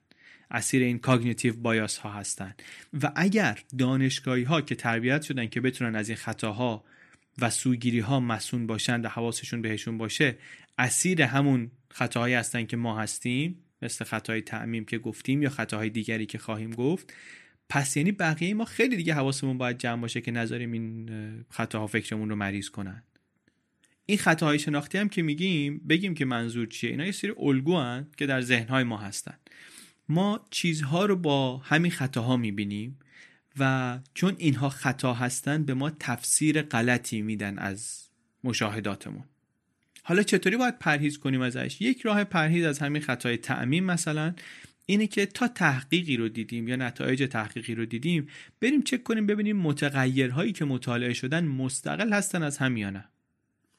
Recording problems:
none

